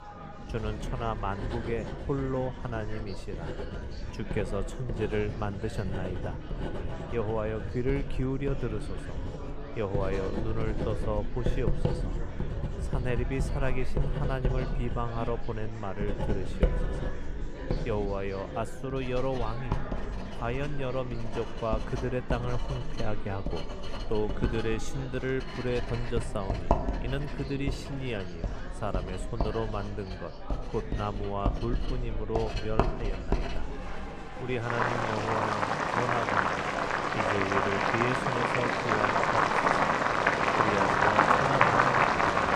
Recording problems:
household noises; very loud; throughout; 3 dB above the speech
murmuring crowd; loud; throughout; 8 dB below the speech

